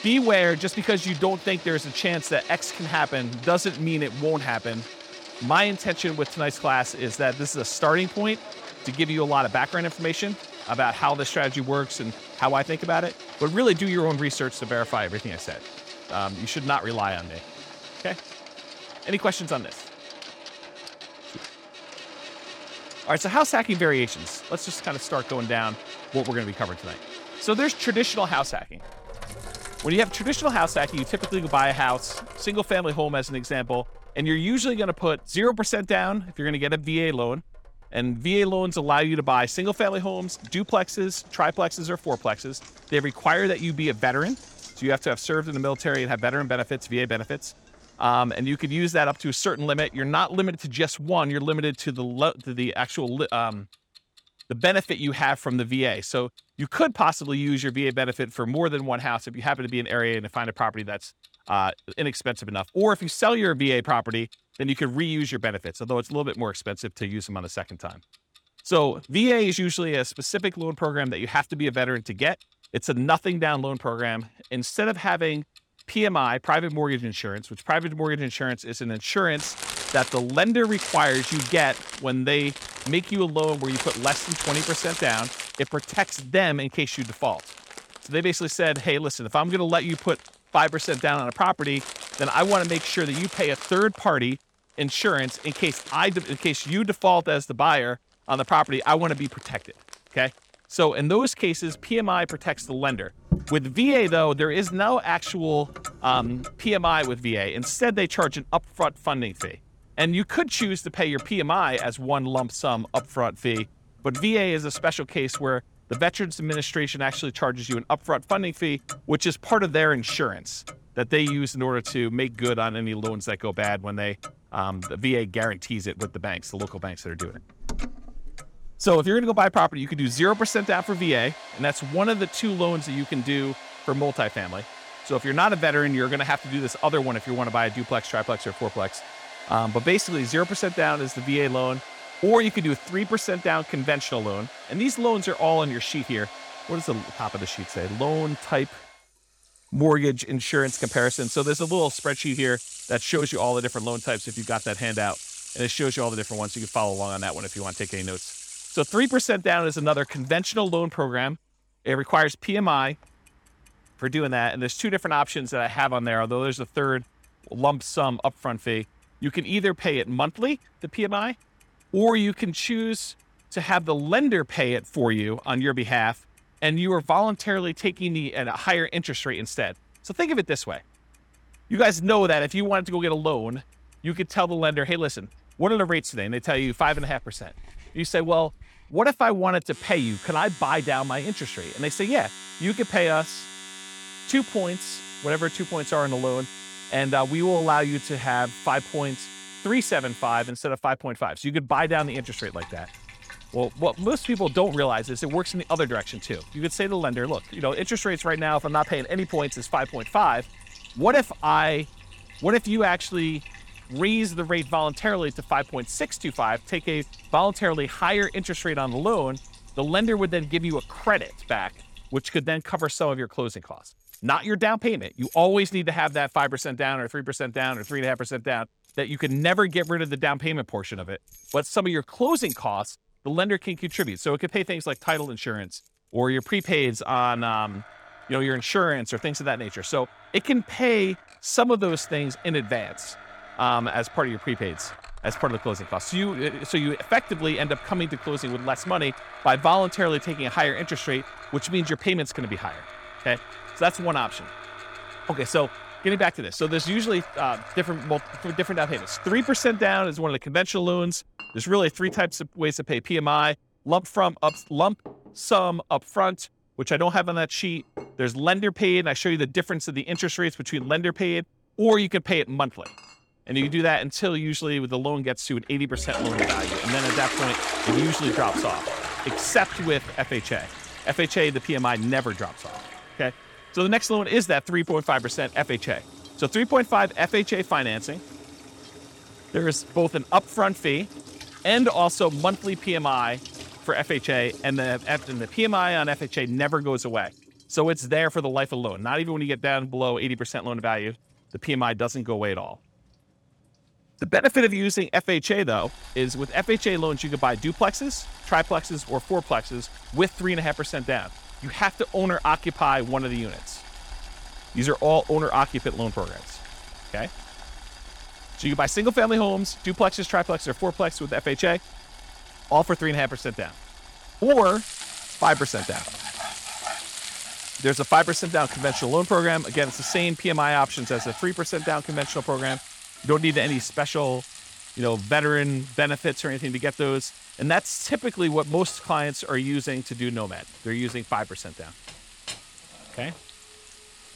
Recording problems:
household noises; noticeable; throughout; 15 dB below the speech

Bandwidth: 18 kHz